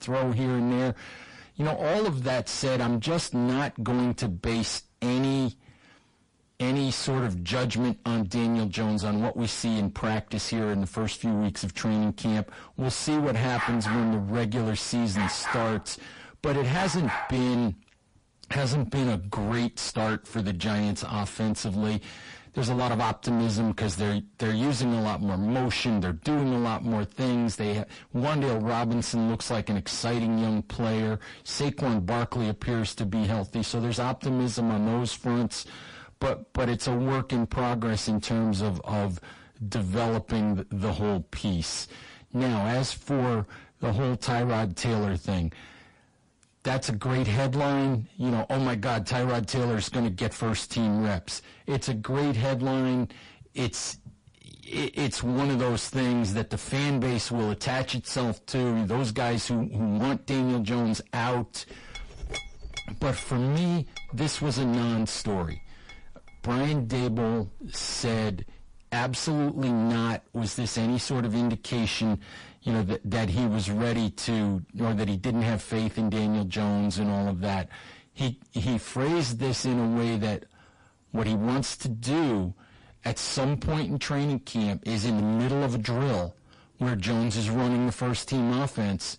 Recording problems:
distortion; heavy; 4 dB below the speech
garbled, watery; slightly; nothing above 10.5 kHz
dog barking; noticeable; from 14 to 17 s; peak level with the speech
clattering dishes; noticeable; from 1:02 to 1:09; peak 8 dB below the speech

